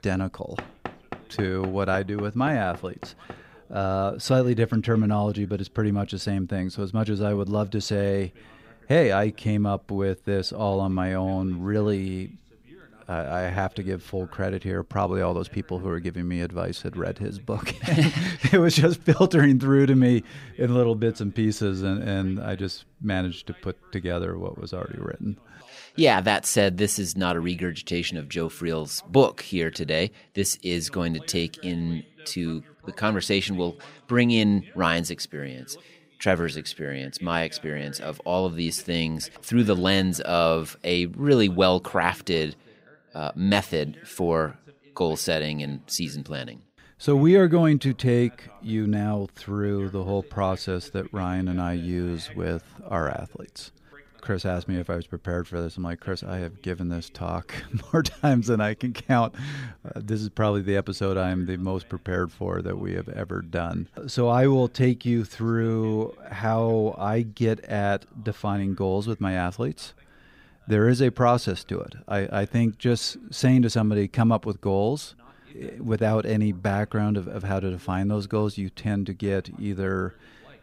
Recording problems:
voice in the background; faint; throughout; 30 dB below the speech
door banging; faint; from 0.5 to 3.5 s; peak 10 dB below the speech

